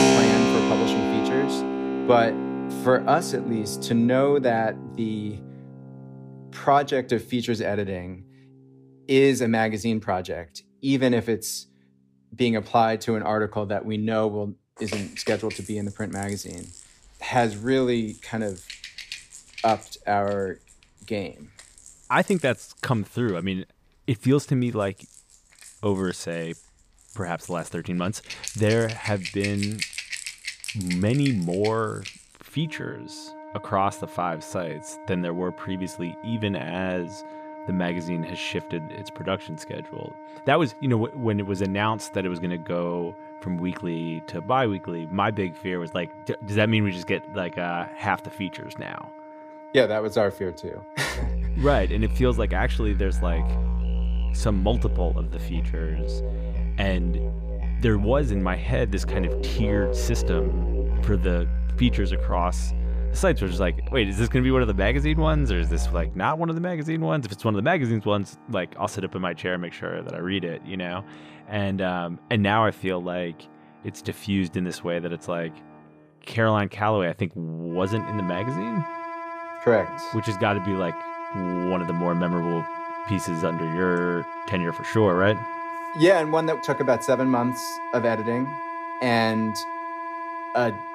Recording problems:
background music; loud; throughout; 5 dB below the speech

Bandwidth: 15 kHz